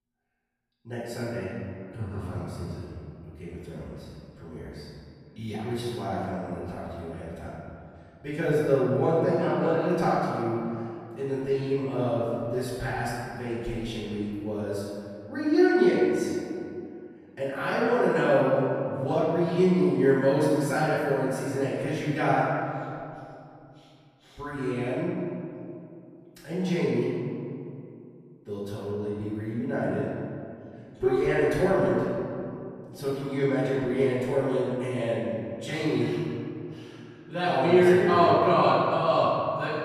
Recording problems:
room echo; strong; dies away in 2.3 s
off-mic speech; far

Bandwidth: 14.5 kHz